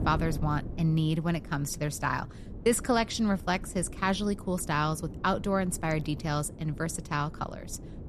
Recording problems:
wind noise on the microphone; occasional gusts; 20 dB below the speech

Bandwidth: 13.5 kHz